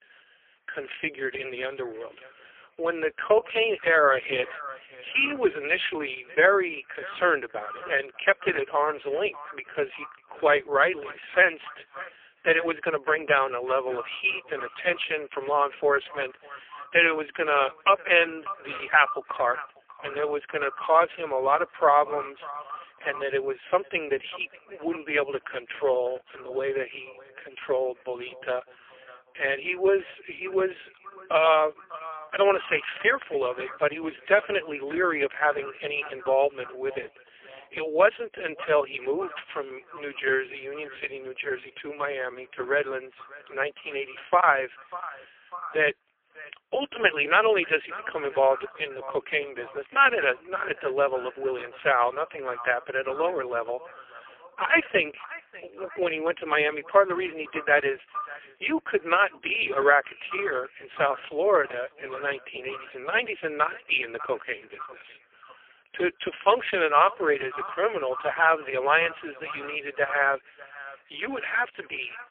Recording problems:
phone-call audio; poor line
thin; very; fading below 300 Hz
echo of what is said; noticeable; throughout; 600 ms later, 15 dB below the speech

